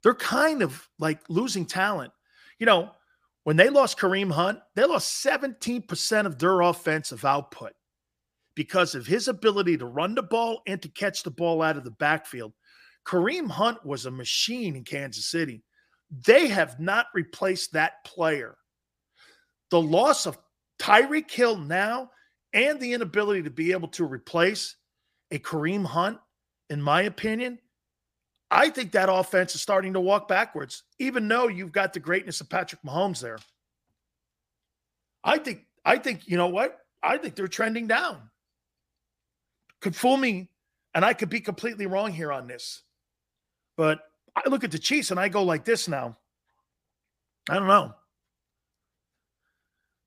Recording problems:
none

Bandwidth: 15 kHz